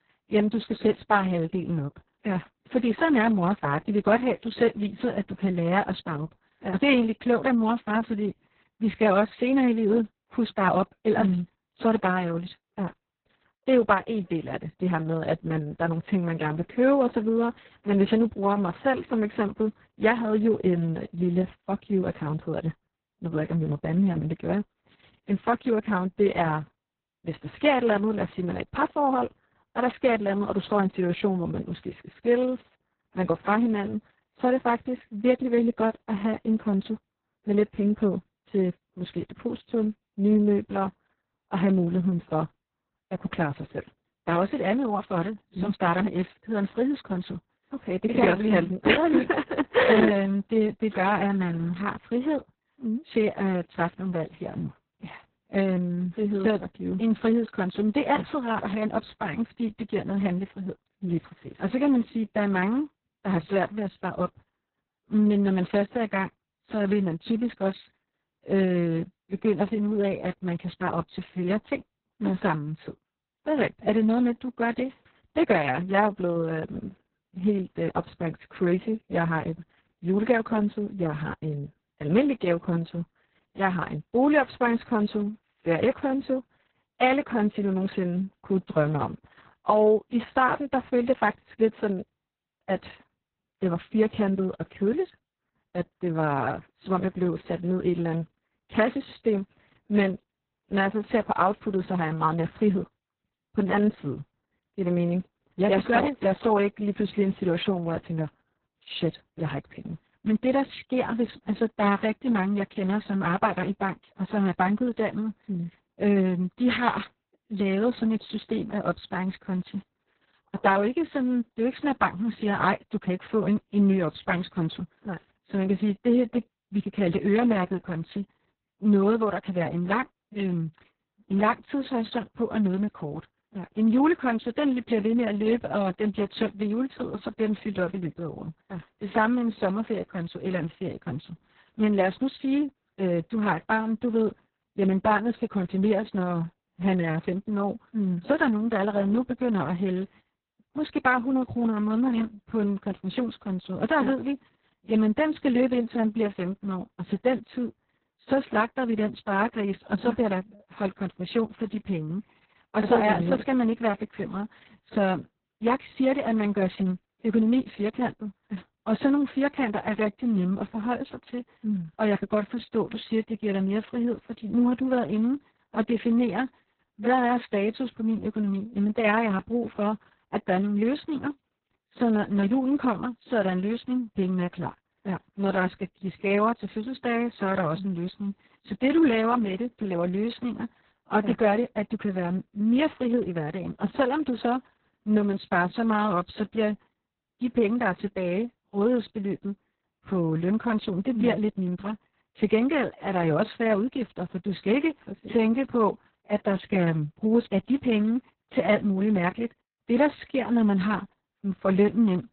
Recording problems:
garbled, watery; badly; nothing above 4 kHz

